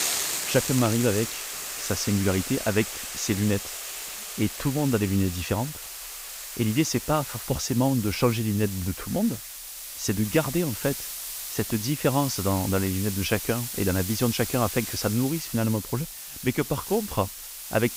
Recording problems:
hiss; loud; throughout; 6 dB below the speech

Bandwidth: 15.5 kHz